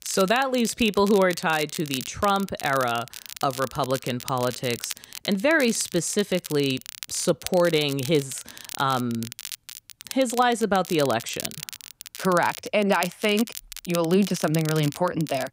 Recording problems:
crackle, like an old record; noticeable; 10 dB below the speech

